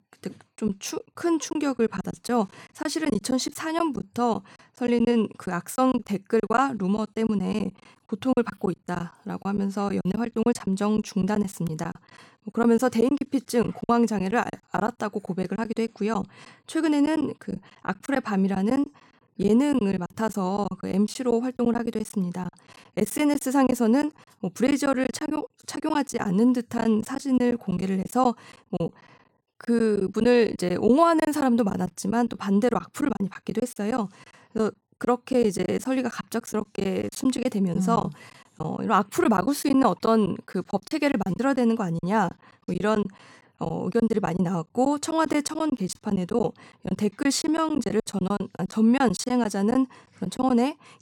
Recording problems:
choppy; very; 12% of the speech affected

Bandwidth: 17.5 kHz